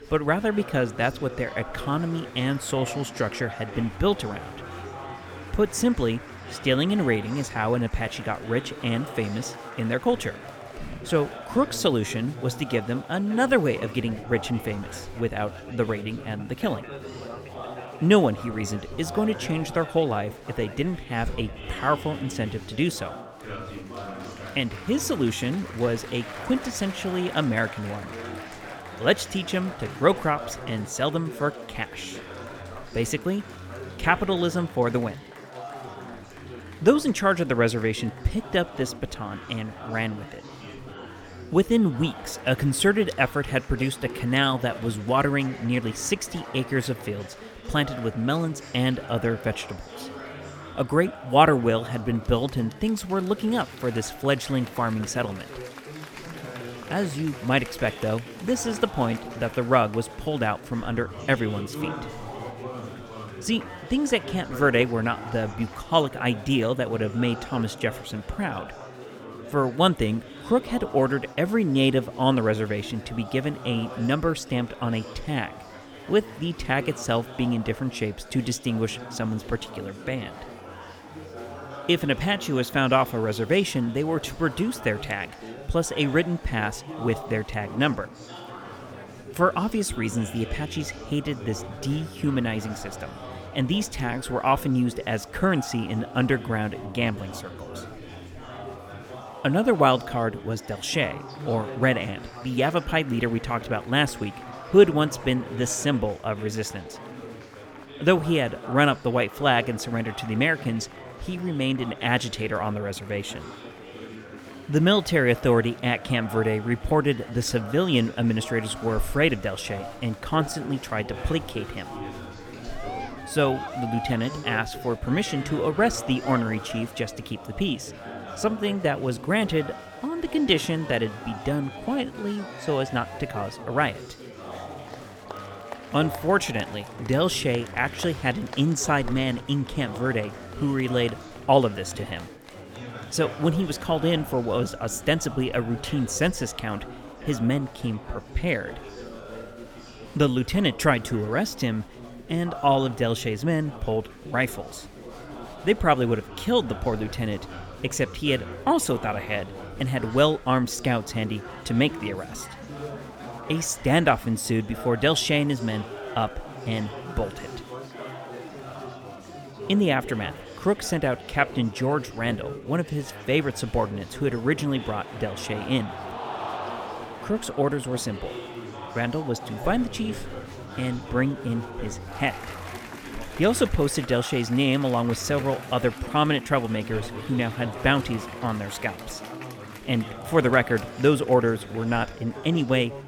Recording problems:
chatter from many people; noticeable; throughout; 15 dB below the speech

